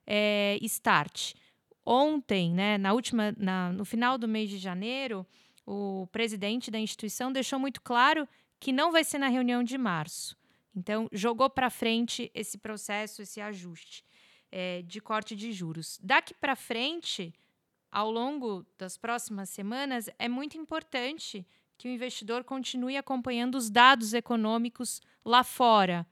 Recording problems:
none

